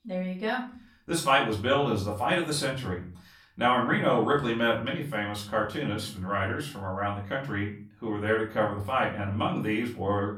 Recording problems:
off-mic speech; far
room echo; slight; dies away in 0.4 s

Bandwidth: 17 kHz